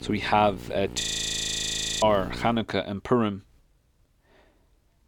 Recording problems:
electrical hum; faint; until 2.5 s; 60 Hz, 20 dB below the speech
audio freezing; at 1 s for 1 s

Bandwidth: 18.5 kHz